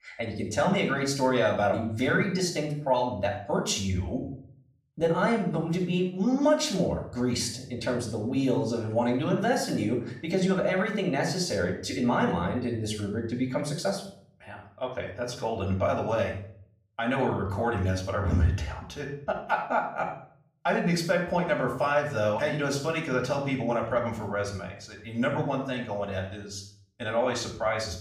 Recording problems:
off-mic speech; far
room echo; noticeable; dies away in 0.5 s

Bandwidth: 15.5 kHz